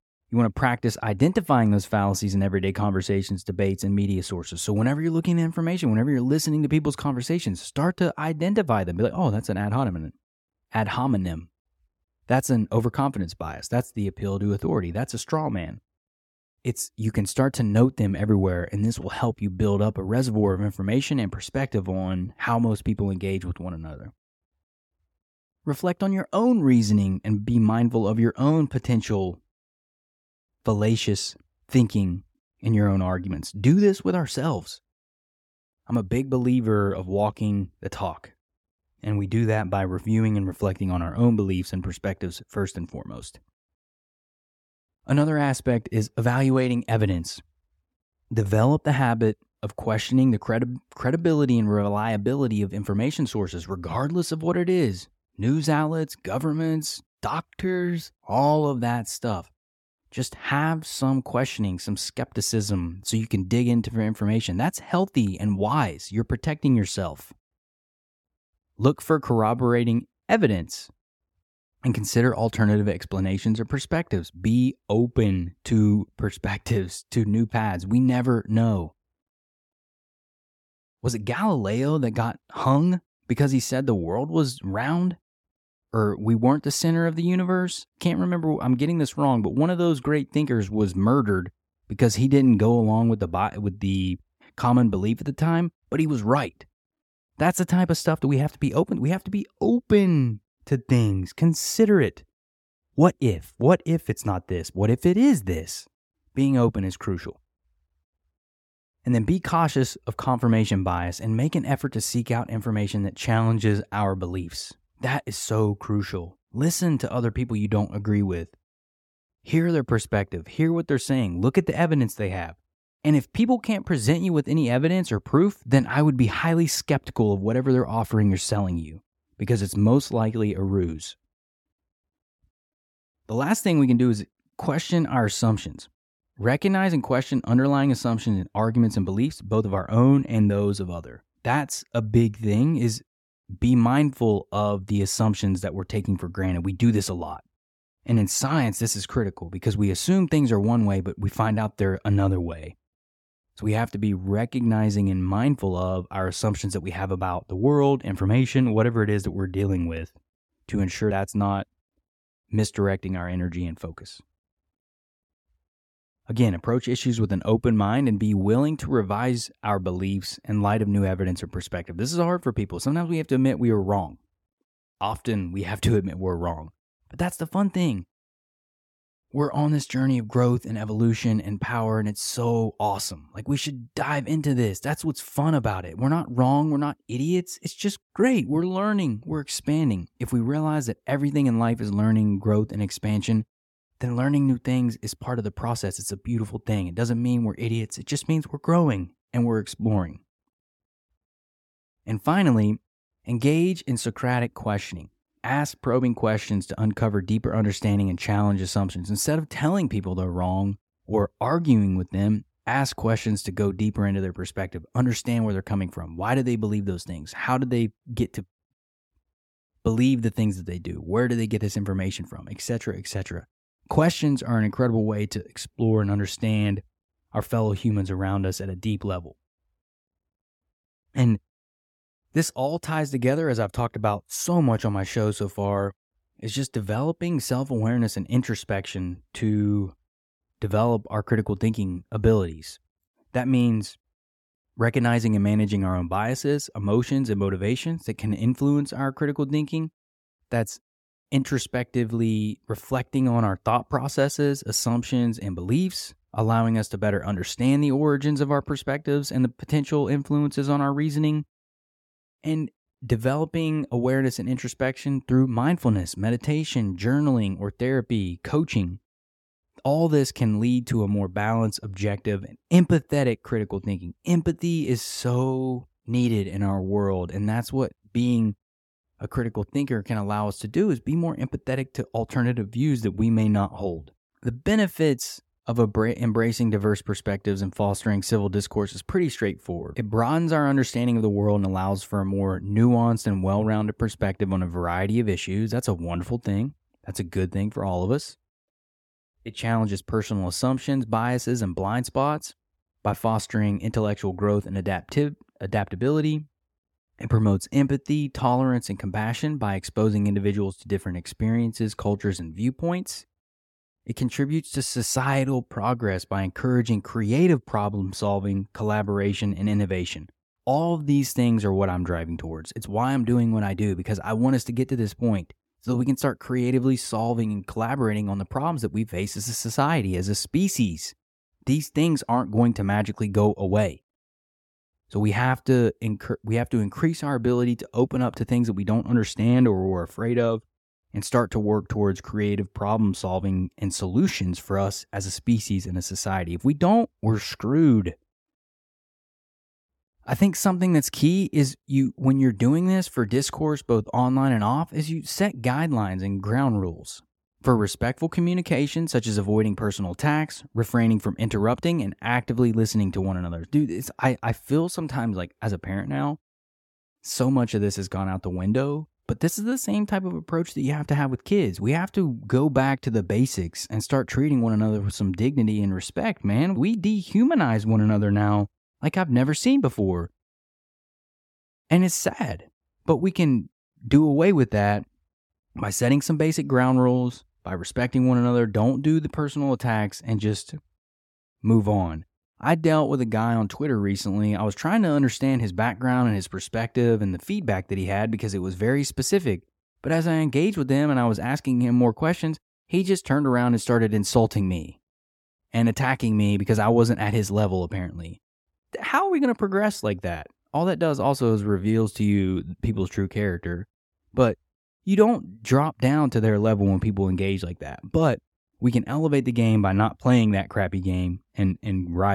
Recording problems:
abrupt cut into speech; at the end

